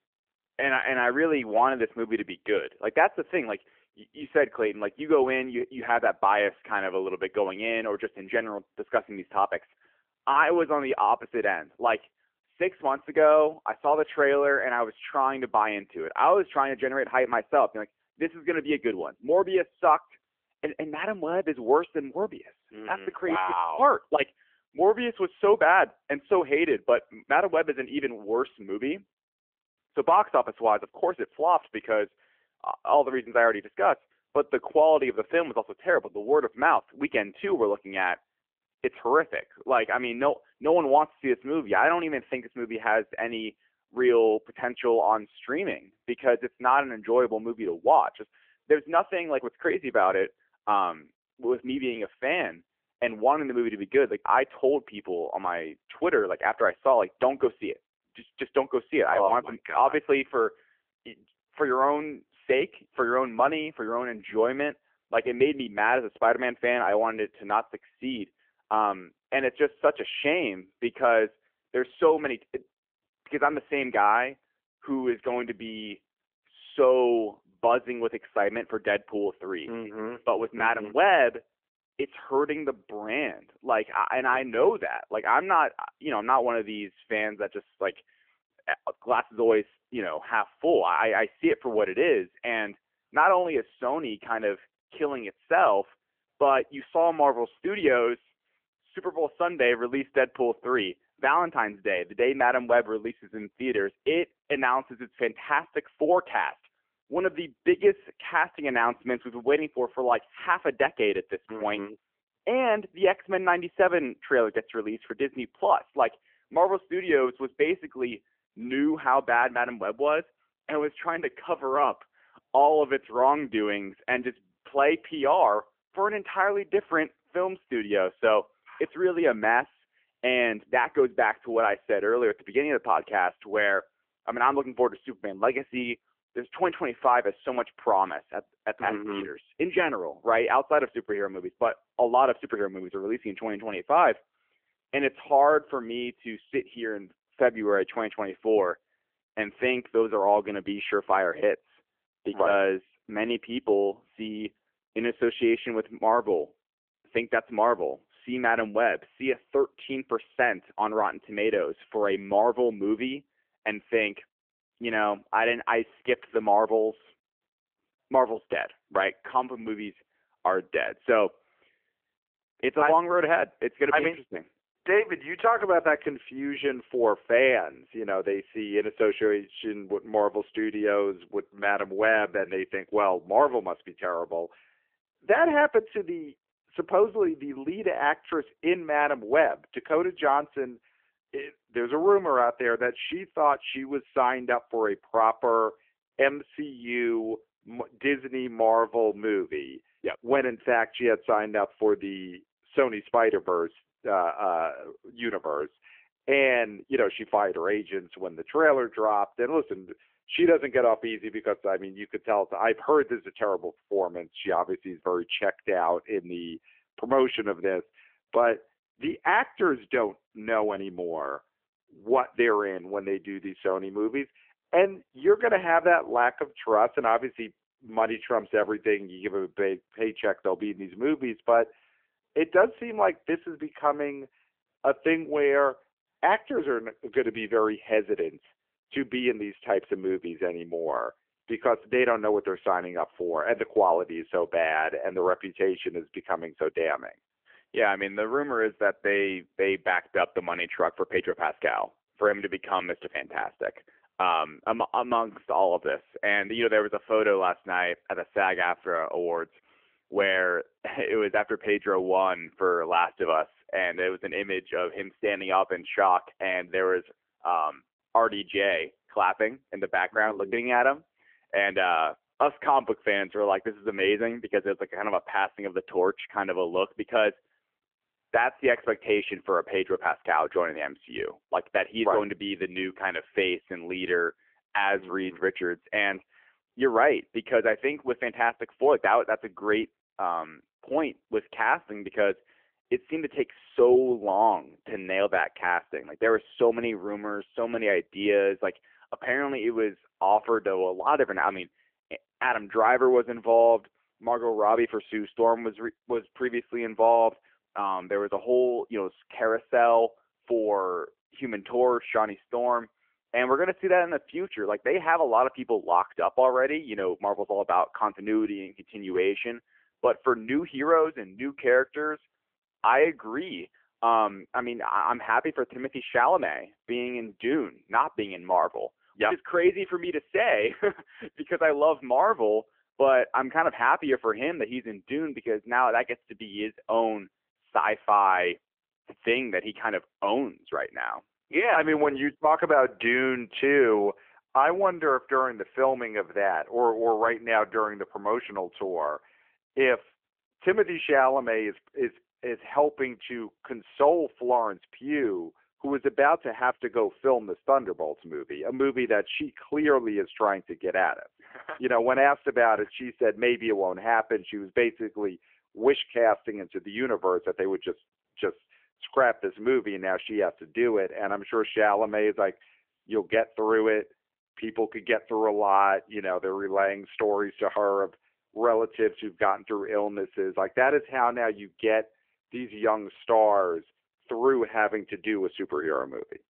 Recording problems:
phone-call audio; nothing above 3 kHz

